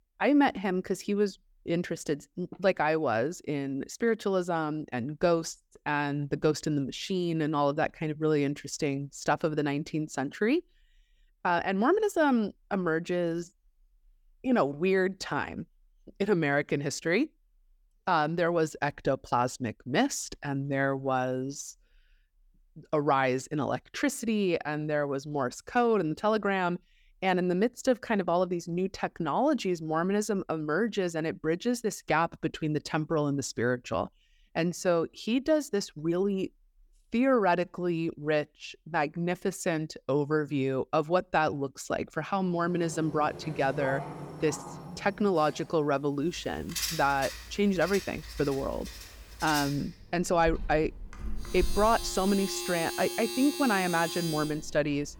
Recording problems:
household noises; loud; from 43 s on; 9 dB below the speech

